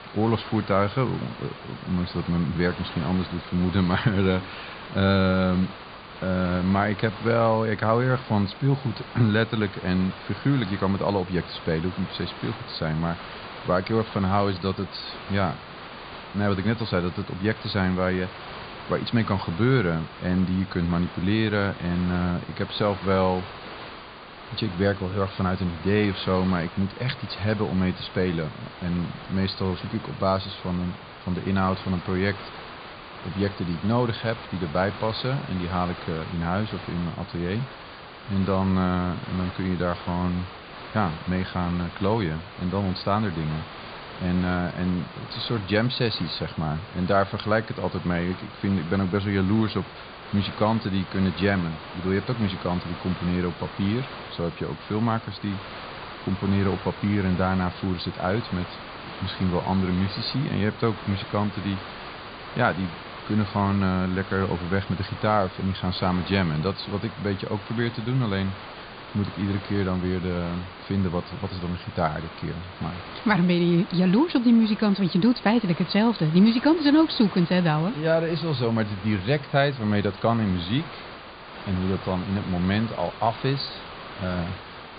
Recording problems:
high frequencies cut off; severe; nothing above 4.5 kHz
hiss; noticeable; throughout; 15 dB below the speech

